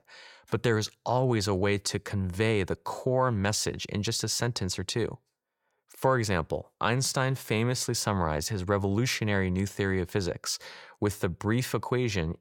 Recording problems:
none

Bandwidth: 17 kHz